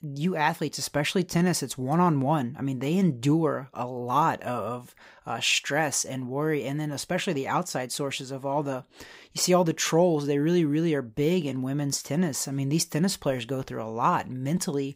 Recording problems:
none

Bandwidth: 15.5 kHz